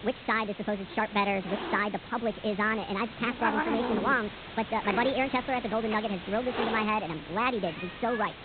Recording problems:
high frequencies cut off; severe; nothing above 4 kHz
wrong speed and pitch; too fast and too high; 1.5 times normal speed
hiss; loud; throughout; 7 dB below the speech

